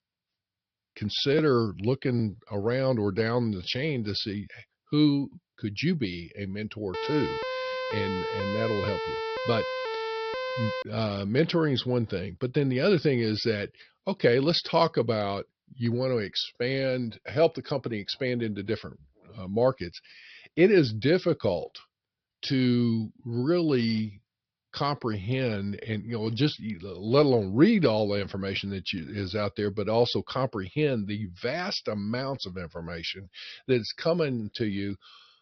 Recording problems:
high frequencies cut off; noticeable; nothing above 5.5 kHz
siren; noticeable; from 7 to 11 s; peak 4 dB below the speech

